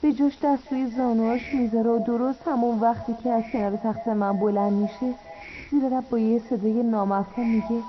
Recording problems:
echo of what is said; noticeable; throughout; 230 ms later, 15 dB below the speech
garbled, watery; slightly; nothing above 6 kHz
muffled; very slightly; fading above 1.5 kHz
hiss; faint; throughout; 20 dB below the speech
uneven, jittery; strongly; from 1 to 6.5 s

